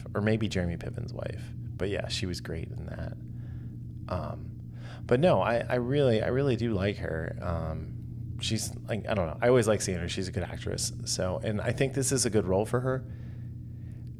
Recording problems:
low rumble; faint; throughout; 20 dB below the speech

